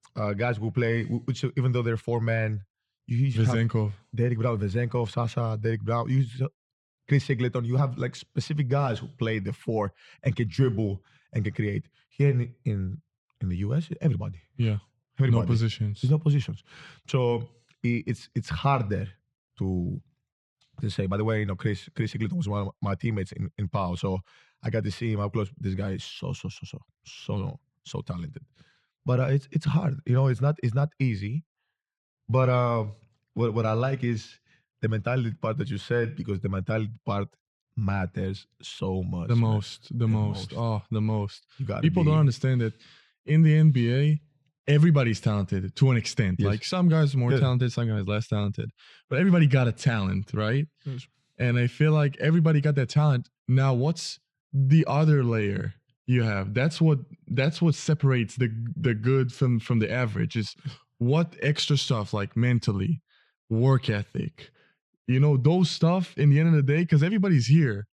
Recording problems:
muffled; very slightly; fading above 3.5 kHz

